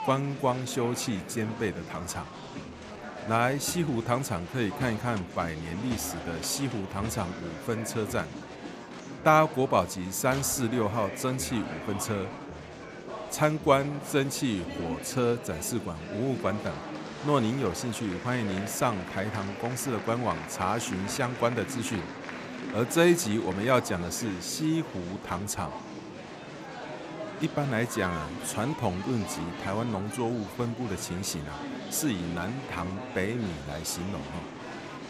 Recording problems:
murmuring crowd; loud; throughout; 9 dB below the speech

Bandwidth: 14.5 kHz